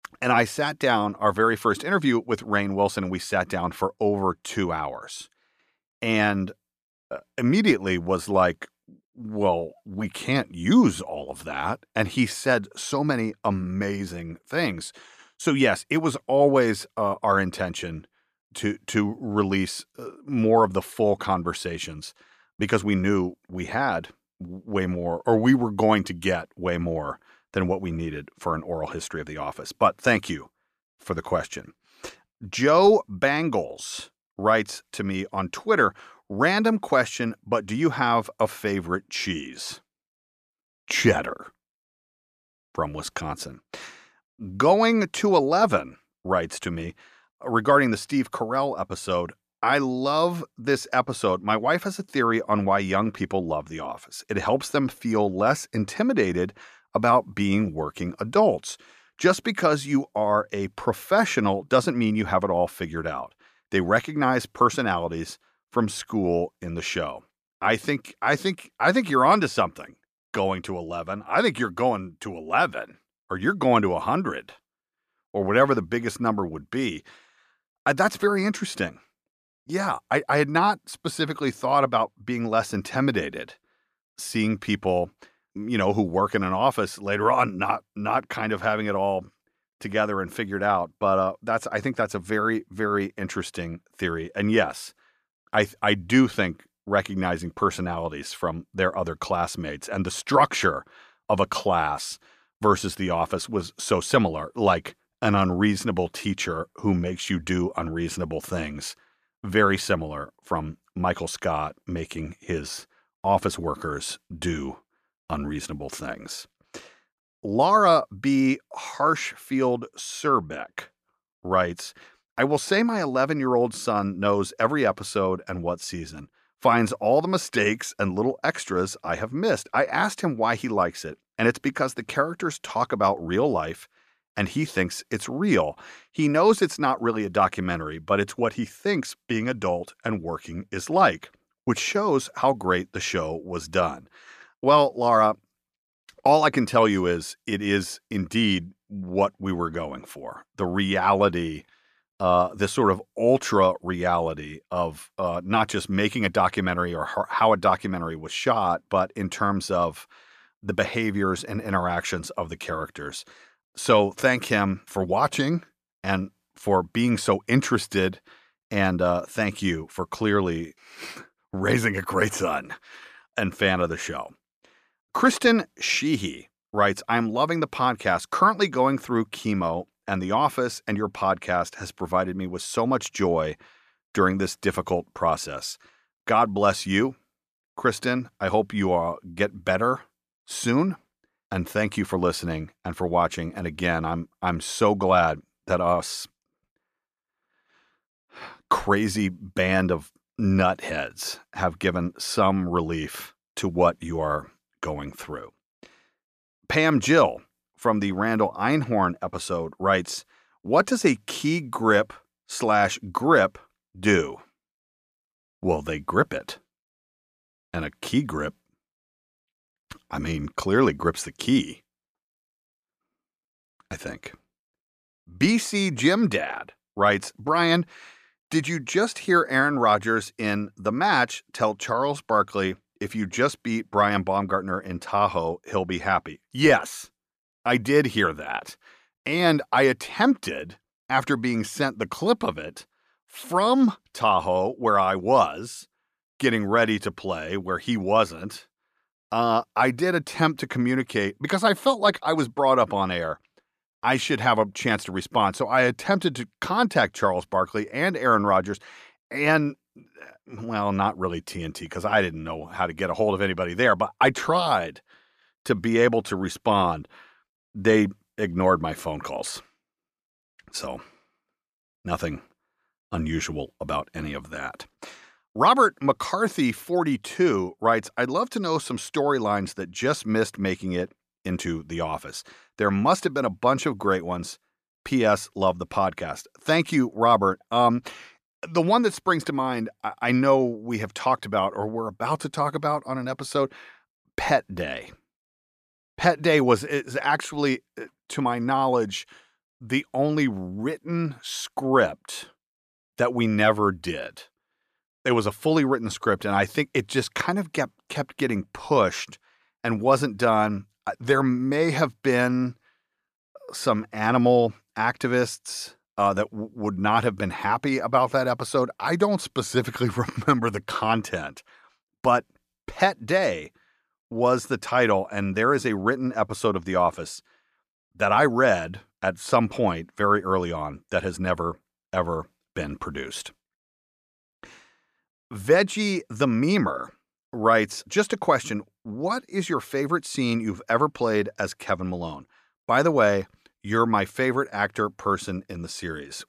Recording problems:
none

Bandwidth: 14.5 kHz